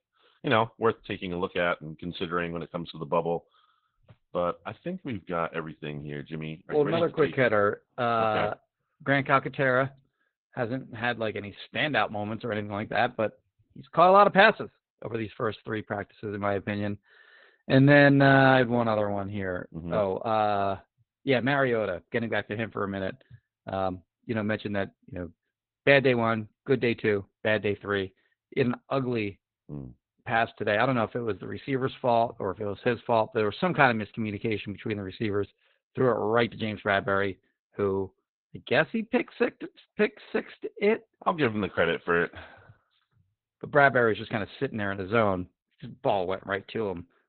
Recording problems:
garbled, watery; badly; nothing above 4 kHz

